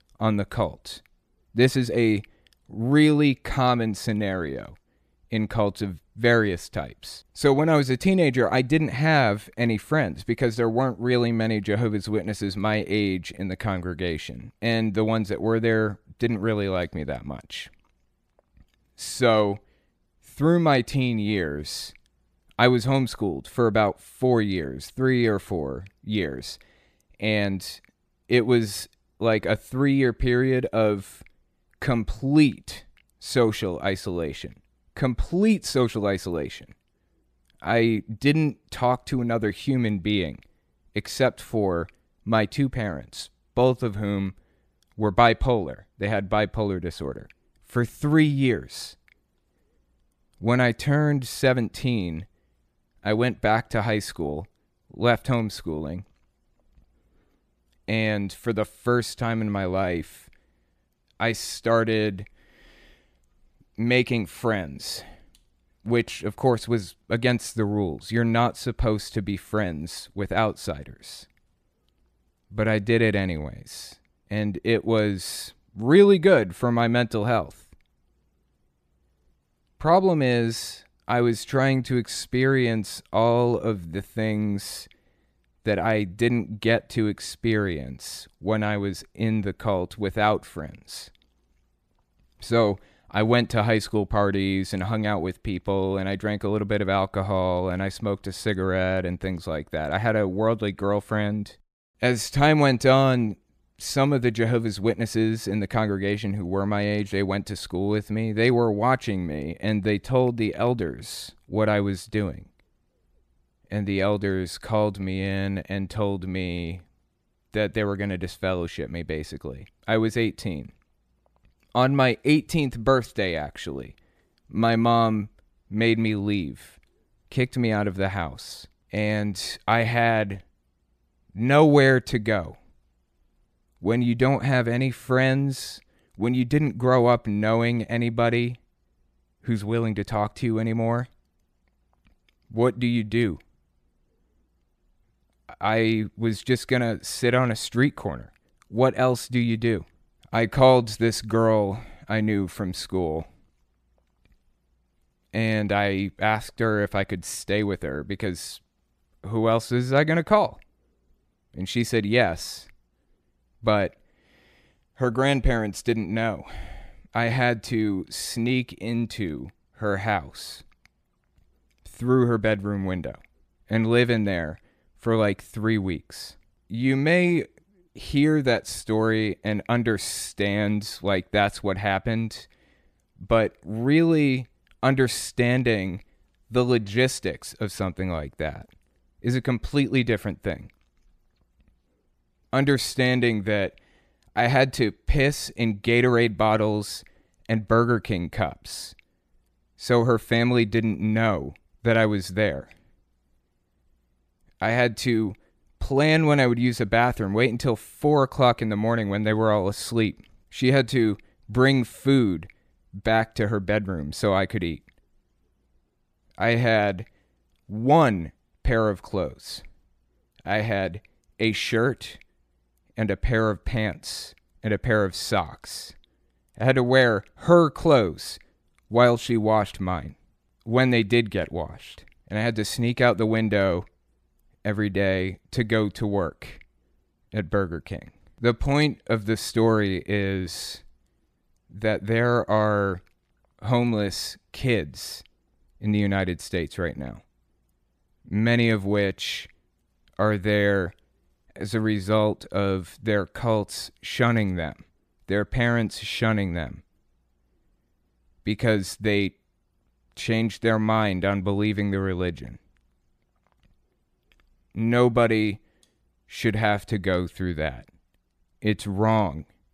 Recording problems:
none

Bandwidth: 14.5 kHz